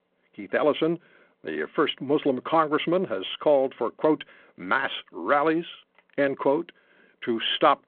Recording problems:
phone-call audio

